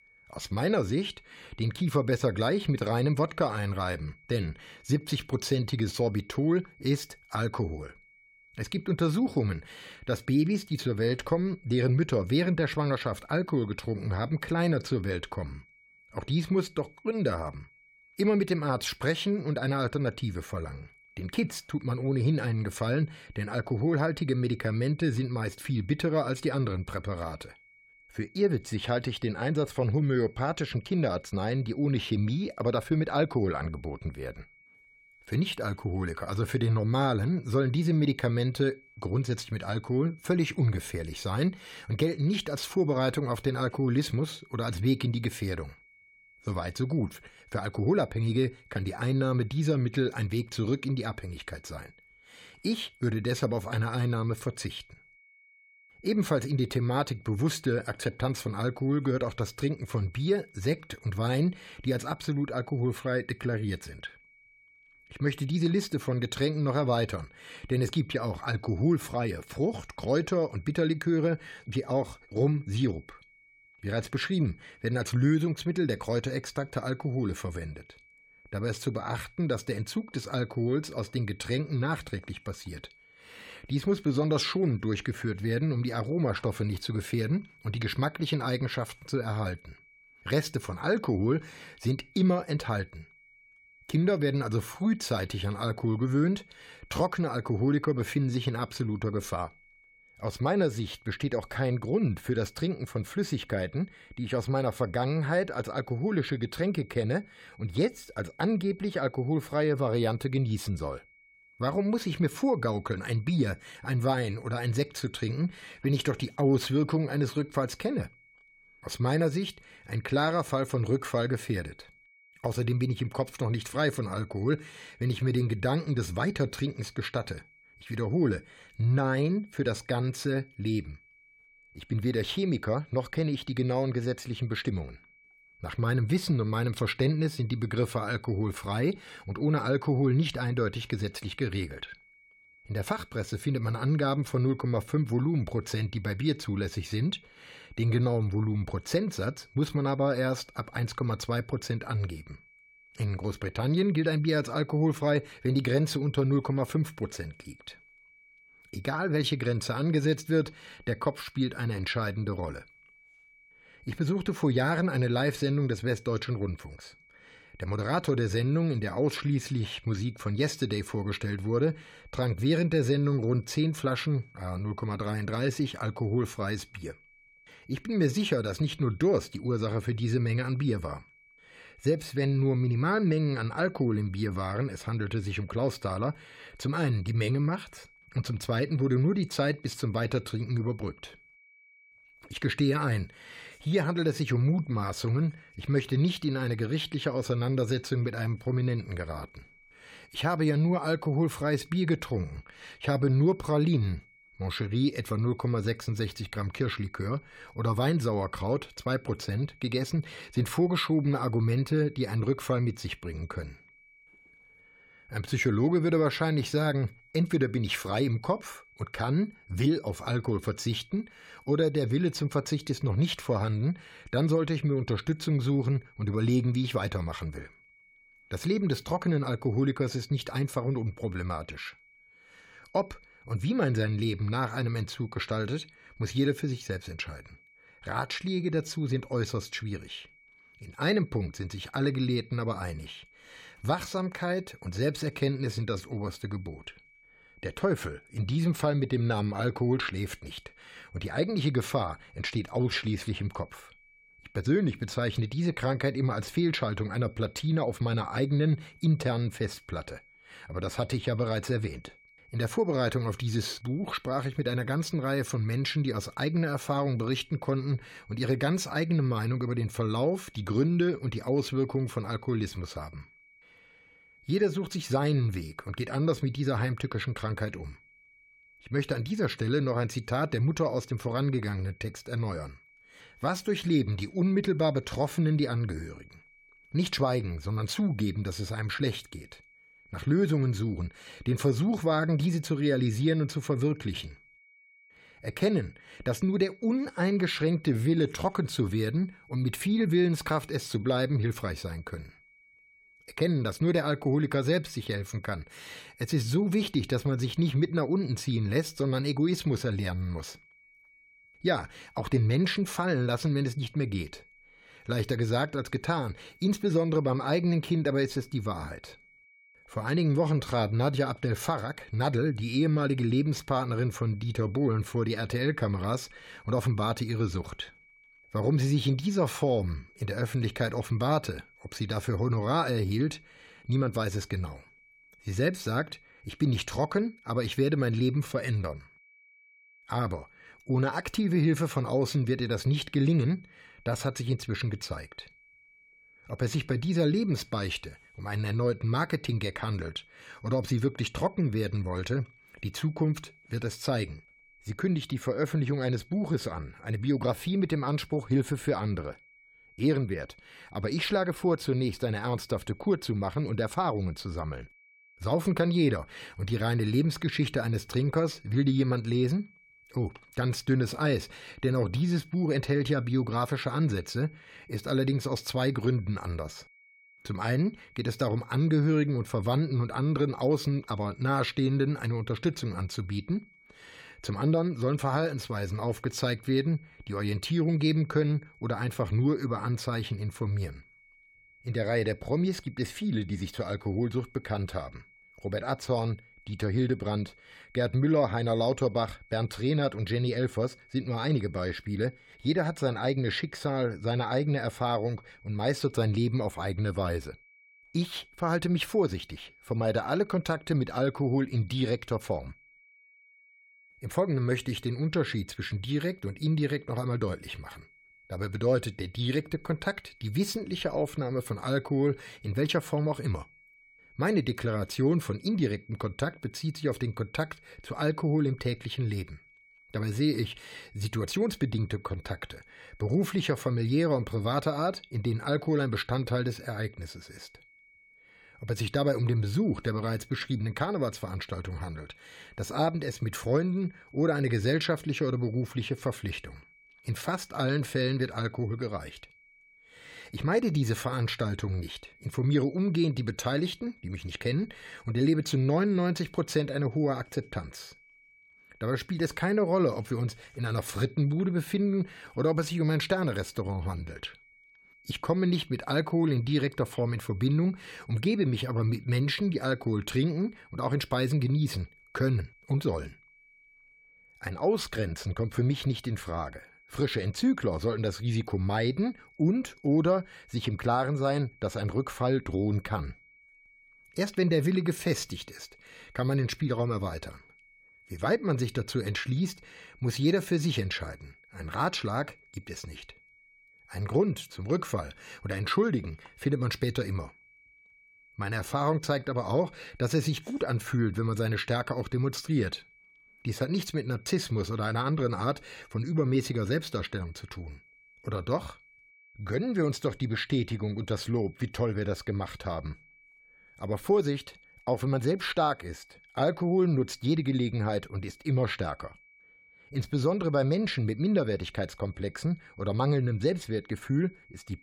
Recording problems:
high-pitched whine; faint; throughout; 2.5 kHz, 25 dB below the speech

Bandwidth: 16.5 kHz